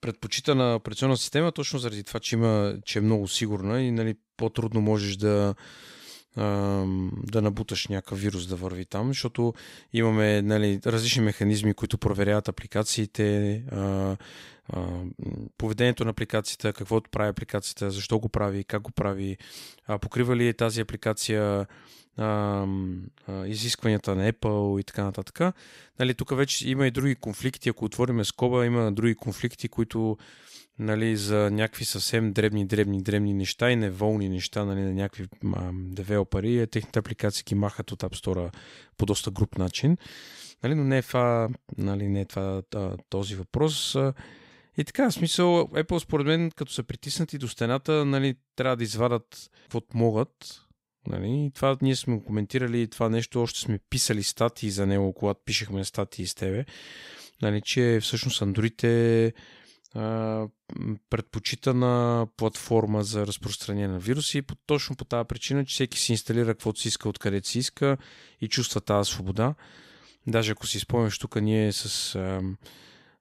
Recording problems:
none

